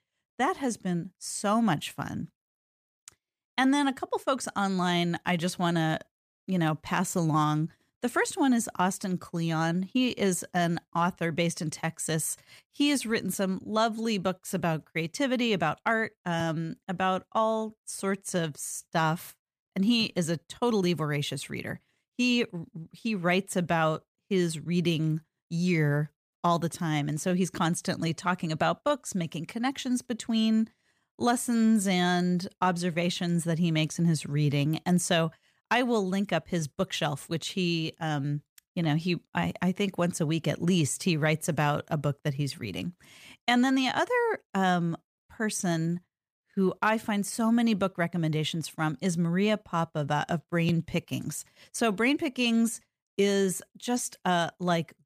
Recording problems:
none

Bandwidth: 15 kHz